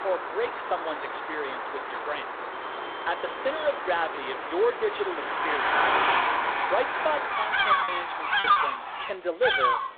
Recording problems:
phone-call audio; poor line
animal sounds; very loud; throughout; 1 dB above the speech
traffic noise; very loud; throughout; 3 dB above the speech
alarms or sirens; faint; throughout; 20 dB below the speech
choppy; occasionally; 1% of the speech affected

